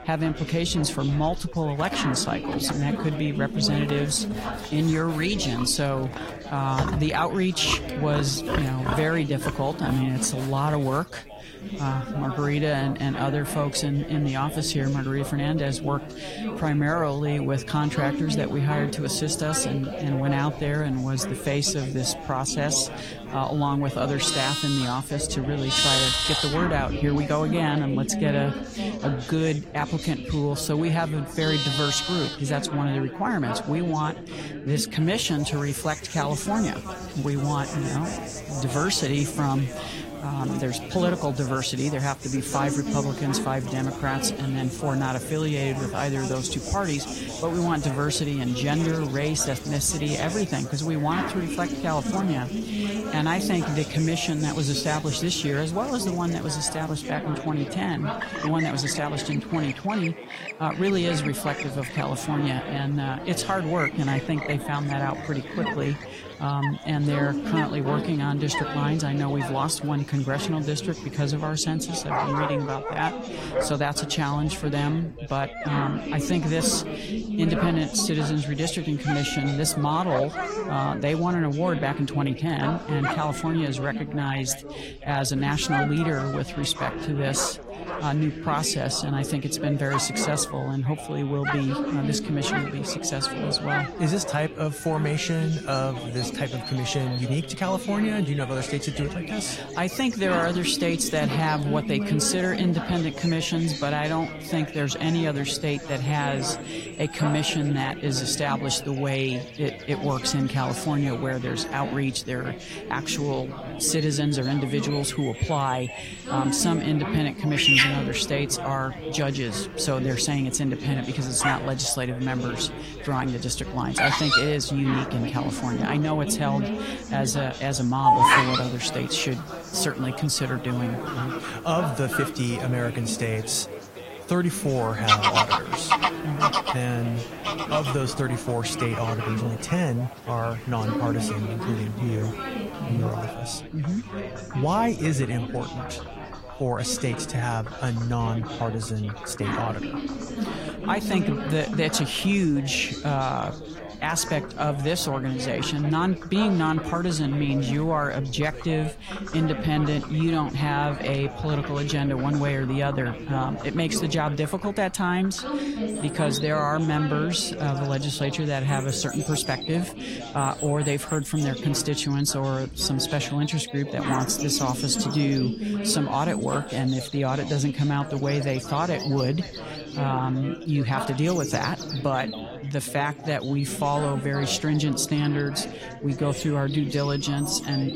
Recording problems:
garbled, watery; slightly; nothing above 16 kHz
animal sounds; loud; throughout; 6 dB below the speech
background chatter; loud; throughout; 4 voices, 8 dB below the speech

